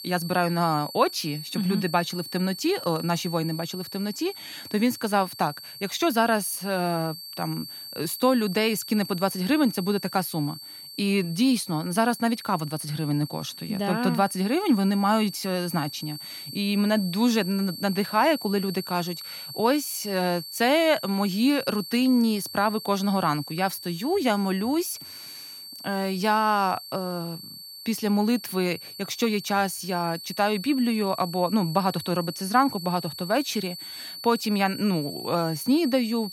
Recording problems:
high-pitched whine; noticeable; throughout; 4.5 kHz, 10 dB below the speech

